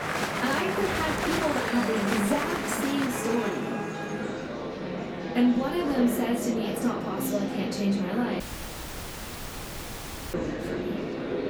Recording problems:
off-mic speech; far
room echo; noticeable; dies away in 0.2 s
traffic noise; loud; throughout; 9 dB below the speech
murmuring crowd; loud; throughout; 3 dB below the speech
crowd noise; faint; throughout; 20 dB below the speech
audio cutting out; at 8.5 s for 2 s

